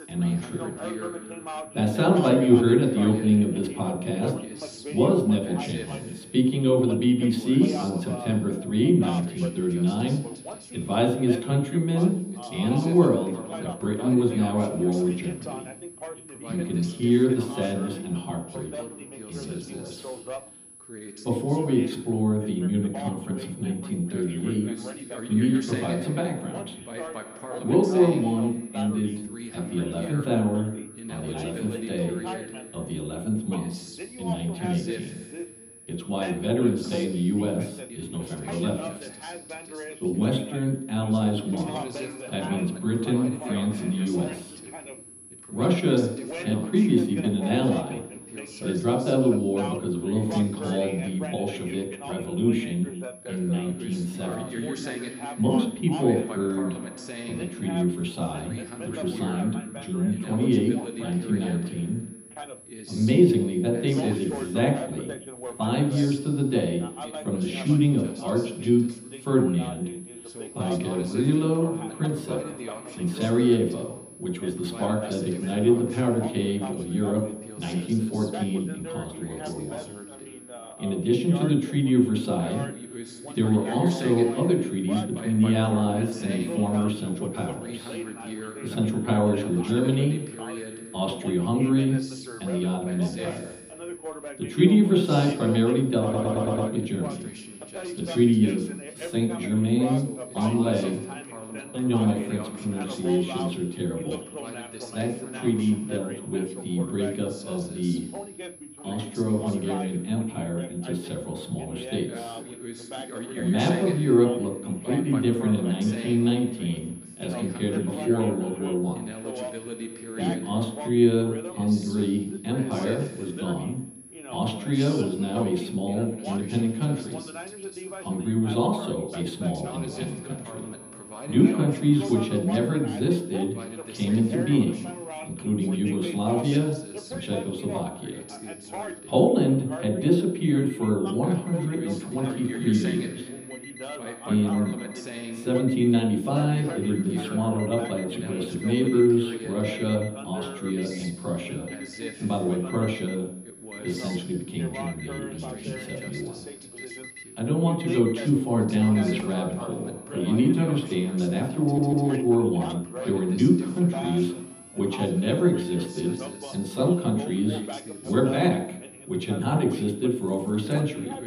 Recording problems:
off-mic speech; far
room echo; noticeable; dies away in 0.8 s
background chatter; noticeable; throughout; 2 voices, 10 dB below the speech
high-pitched whine; faint; throughout; 10.5 kHz, 20 dB below the speech
alarms or sirens; faint; throughout; 20 dB below the speech
audio stuttering; at 1:36 and at 2:42

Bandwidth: 15 kHz